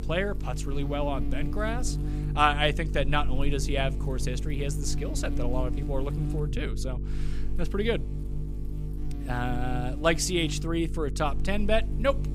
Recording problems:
electrical hum; noticeable; throughout; 50 Hz, 15 dB below the speech

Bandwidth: 15 kHz